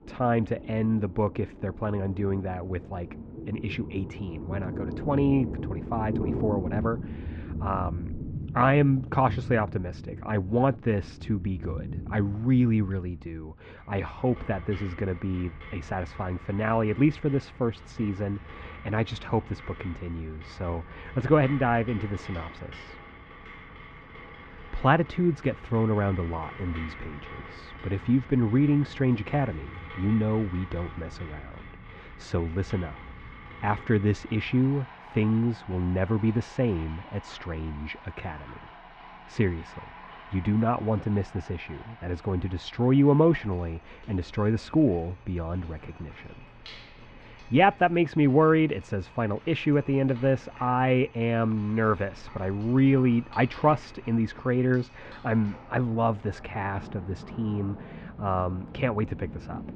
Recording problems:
muffled; very; fading above 2.5 kHz
rain or running water; noticeable; throughout; 15 dB below the speech

